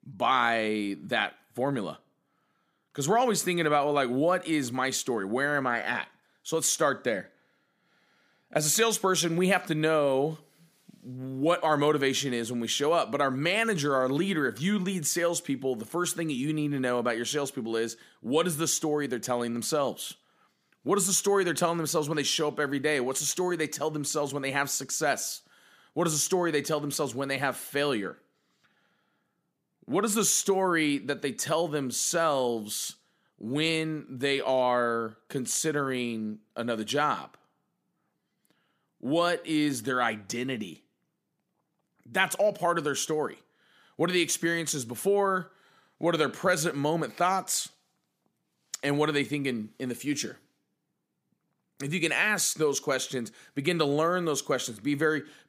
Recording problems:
none

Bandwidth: 15 kHz